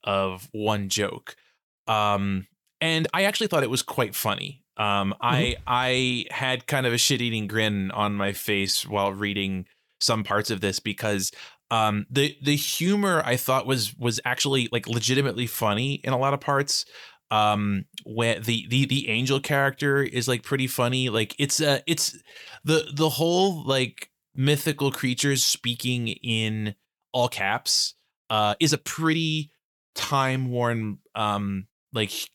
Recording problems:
uneven, jittery; strongly; from 1.5 to 30 s

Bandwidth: 19 kHz